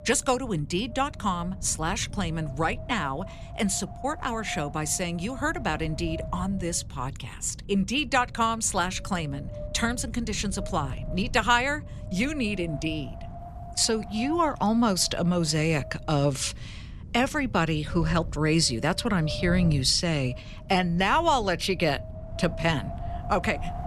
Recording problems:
wind noise on the microphone; occasional gusts; 15 dB below the speech

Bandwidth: 14.5 kHz